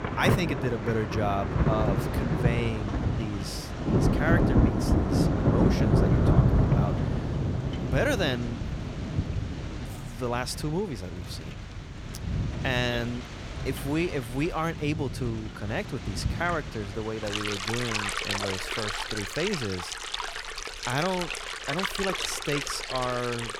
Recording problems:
rain or running water; very loud; throughout; 3 dB above the speech

